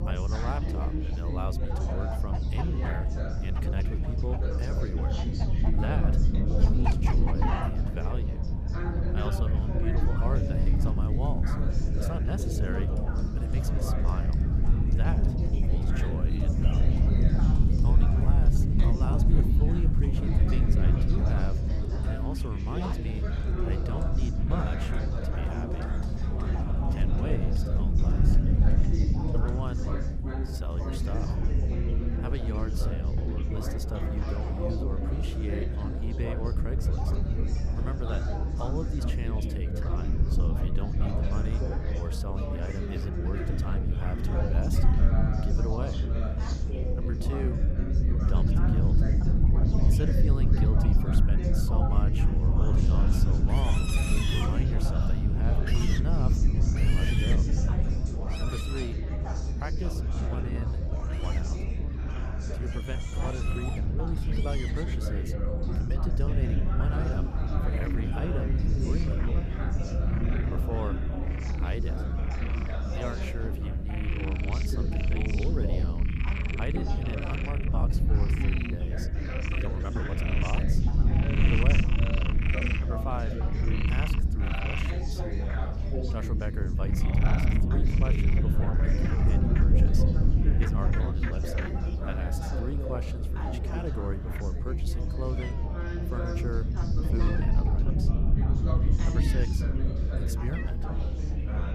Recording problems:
animal sounds; loud; throughout; 3 dB below the speech
chatter from many people; loud; throughout; 1 dB below the speech
low rumble; loud; throughout; 1 dB below the speech
wind noise on the microphone; occasional gusts; 25 dB below the speech
uneven, jittery; strongly; from 18 s to 1:38

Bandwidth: 14.5 kHz